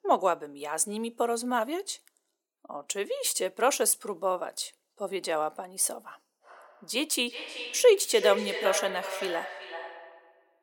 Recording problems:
echo of what is said; strong; from 6.5 s on; 380 ms later, 7 dB below the speech
thin; very; fading below 350 Hz

